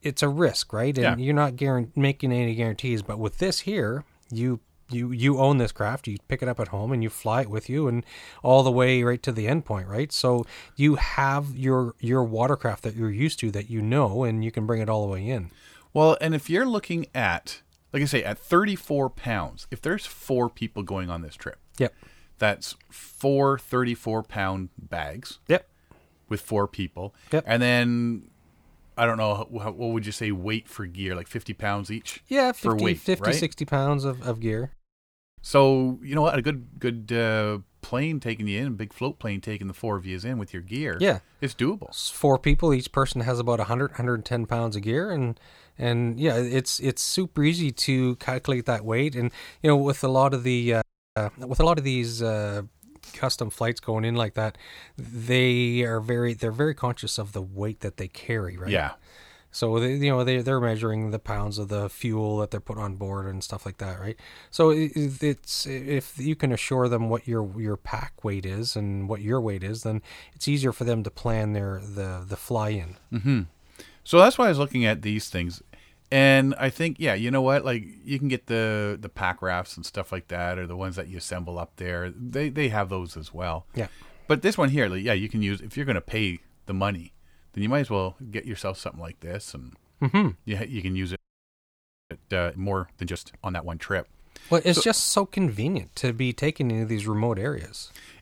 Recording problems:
audio freezing; at 35 s for 0.5 s, at 51 s and at 1:31 for 1 s

